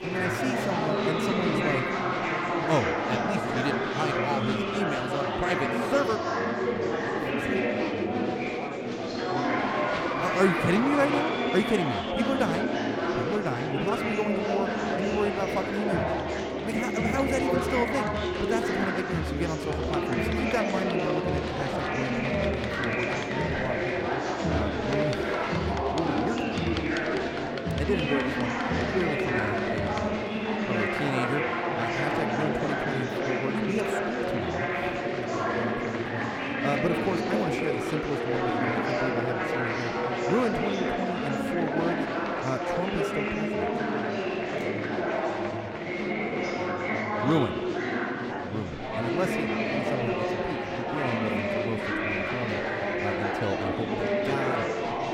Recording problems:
murmuring crowd; very loud; throughout; 4 dB above the speech

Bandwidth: 17.5 kHz